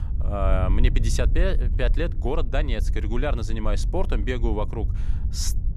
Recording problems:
wind noise on the microphone; occasional gusts; 15 dB below the speech

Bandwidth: 15 kHz